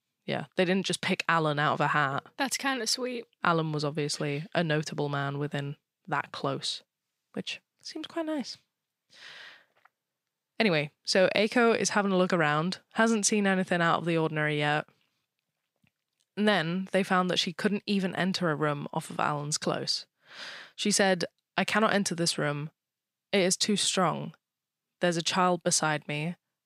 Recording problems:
none

